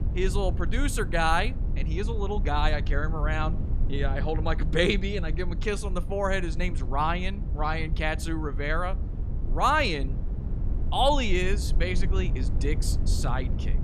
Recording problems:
low rumble; noticeable; throughout; 15 dB below the speech

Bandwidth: 14.5 kHz